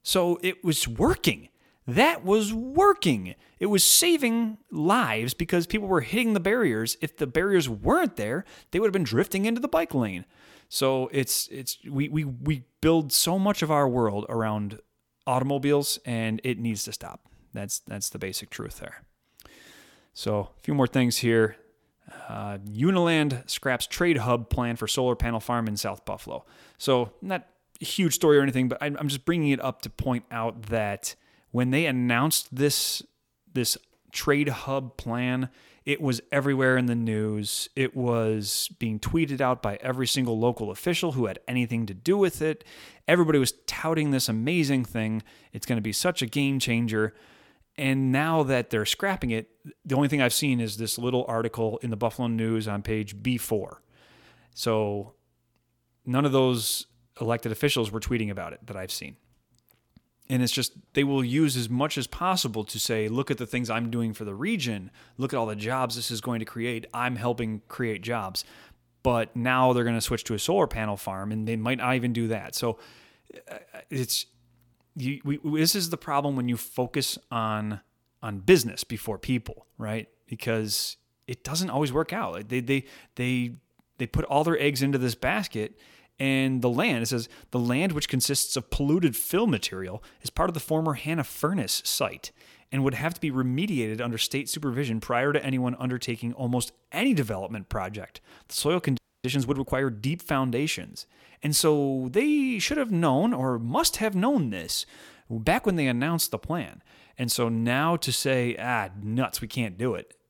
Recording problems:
audio freezing; at 1:39

